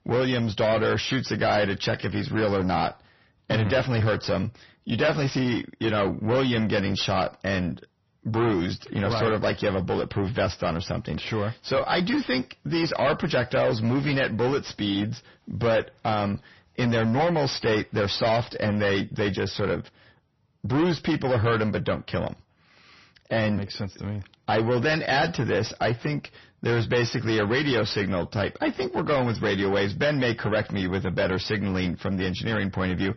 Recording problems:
distortion; heavy; 6 dB below the speech
garbled, watery; slightly; nothing above 6 kHz

